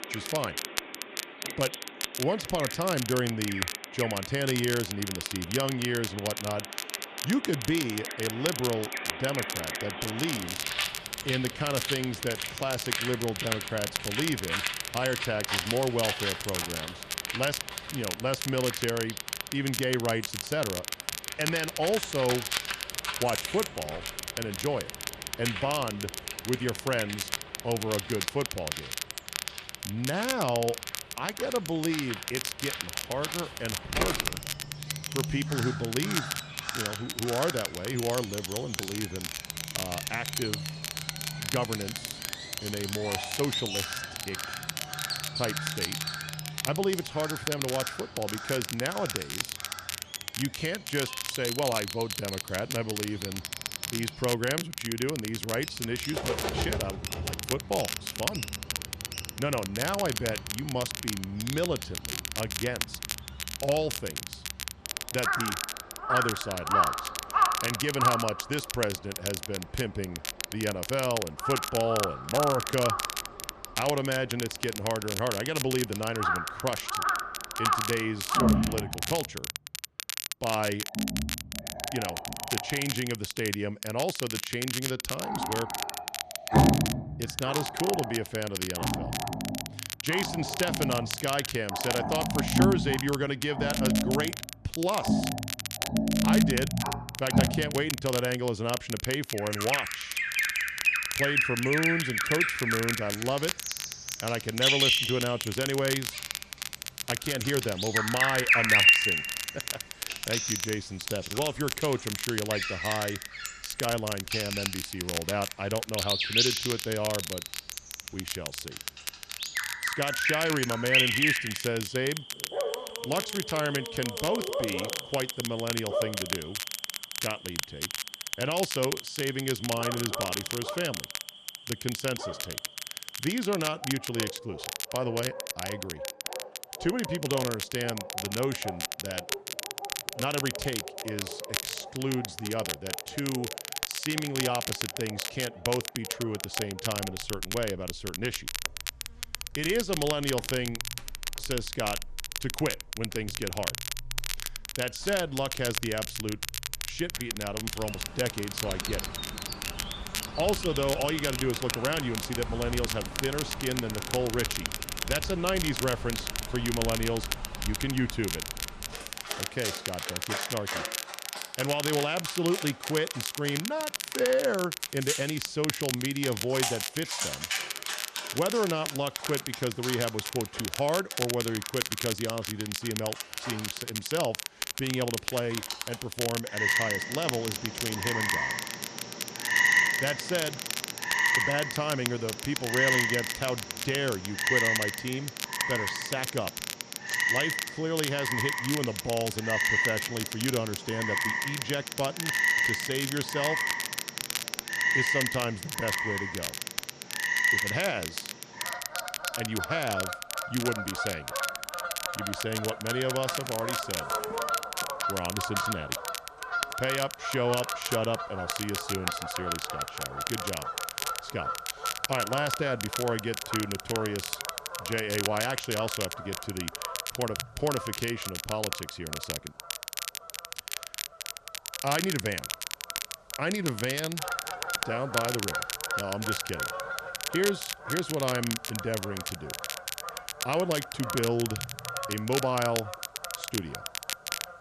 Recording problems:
animal sounds; very loud; throughout; as loud as the speech
crackle, like an old record; loud; 3 dB below the speech

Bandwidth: 14 kHz